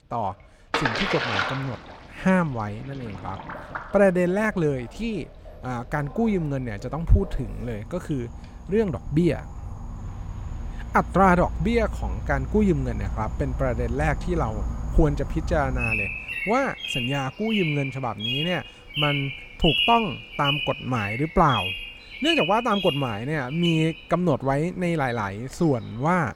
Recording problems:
animal sounds; loud; throughout; 4 dB below the speech
rain or running water; loud; throughout; 5 dB below the speech

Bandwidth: 16.5 kHz